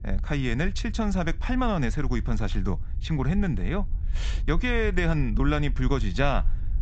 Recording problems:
high frequencies cut off; noticeable; nothing above 8 kHz
low rumble; faint; throughout; 20 dB below the speech

